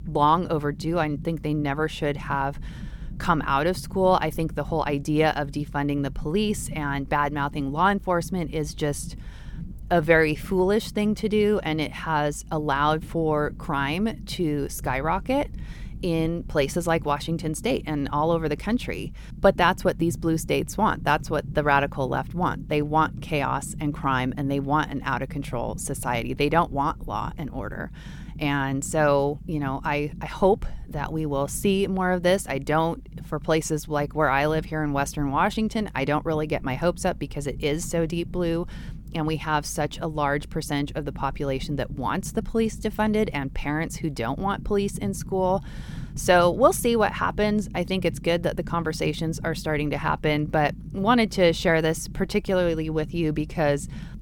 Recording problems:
low rumble; faint; throughout; 25 dB below the speech

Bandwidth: 17.5 kHz